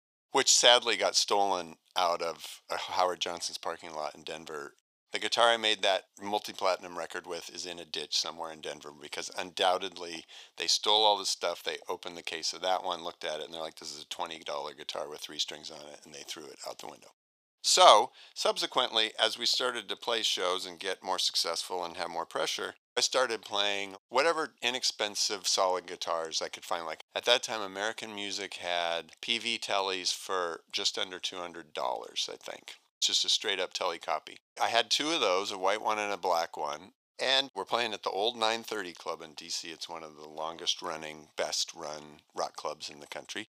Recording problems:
thin; very; fading below 550 Hz

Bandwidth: 15 kHz